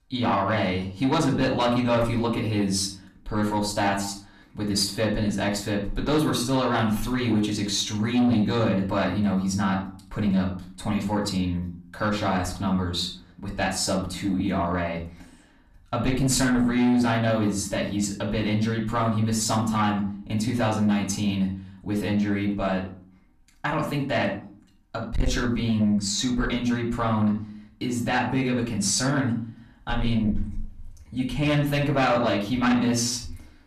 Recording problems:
off-mic speech; far
room echo; slight; dies away in 0.4 s
distortion; slight; 10 dB below the speech

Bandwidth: 14 kHz